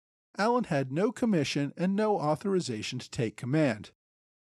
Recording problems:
none

